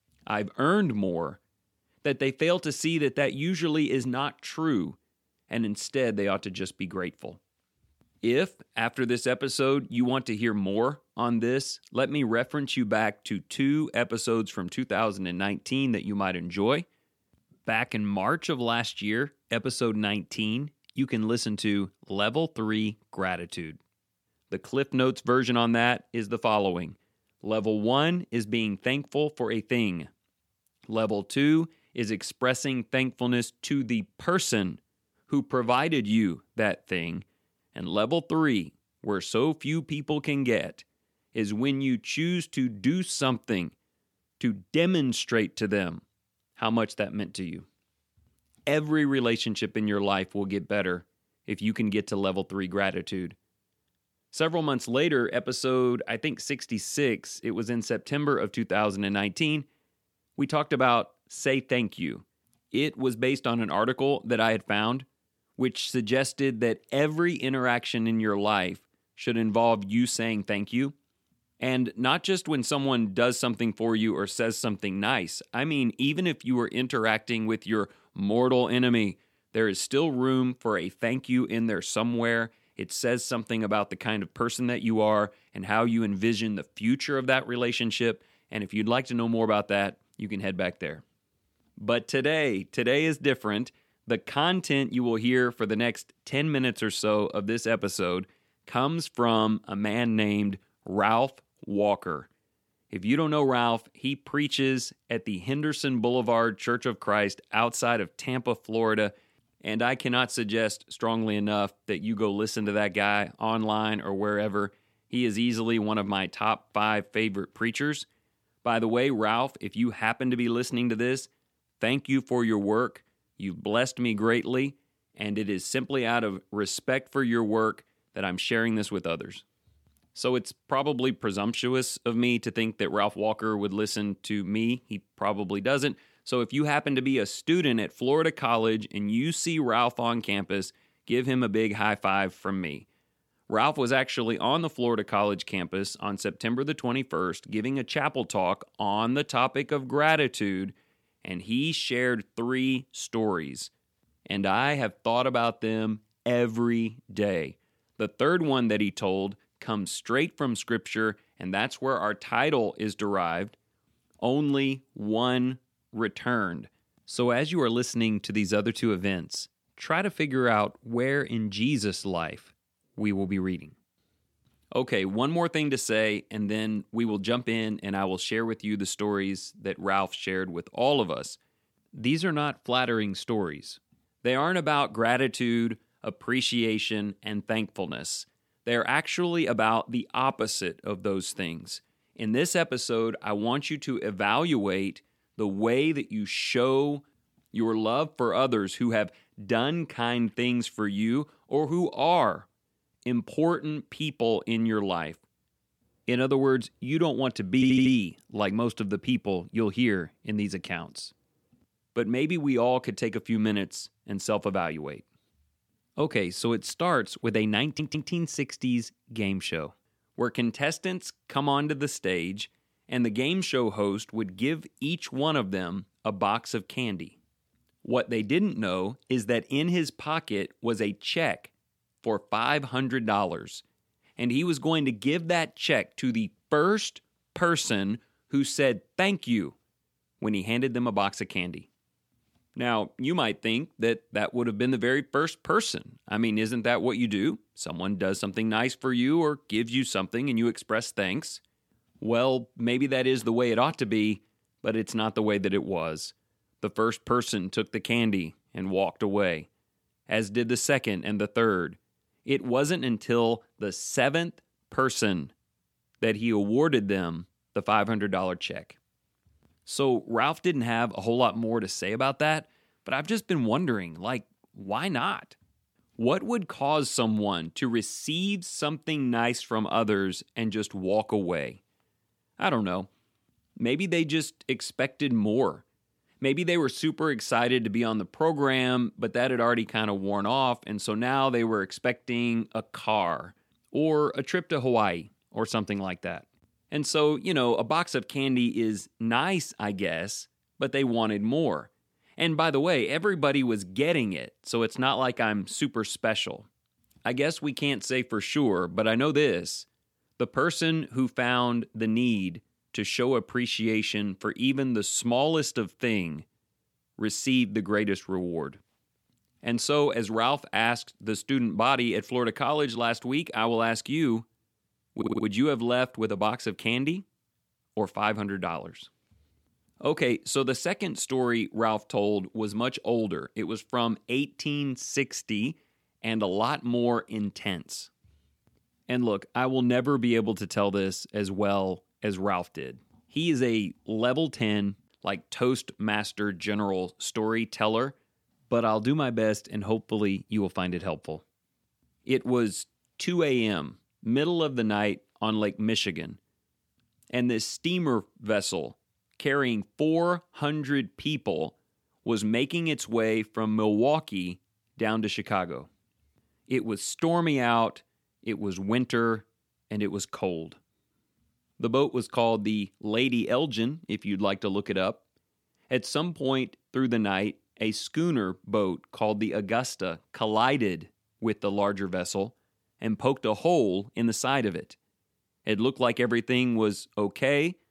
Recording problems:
audio stuttering; at 3:28, at 3:38 and at 5:25

